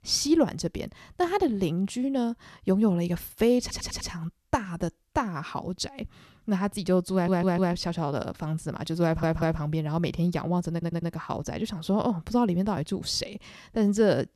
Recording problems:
audio stuttering; 4 times, first at 3.5 s

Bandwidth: 13.5 kHz